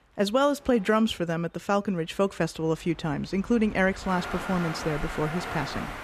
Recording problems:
train or aircraft noise; loud; throughout; 9 dB below the speech

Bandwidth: 14.5 kHz